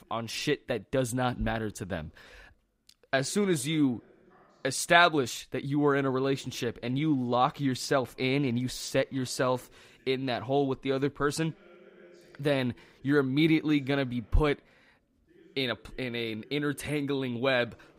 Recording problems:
voice in the background; faint; throughout; 30 dB below the speech

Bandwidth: 15.5 kHz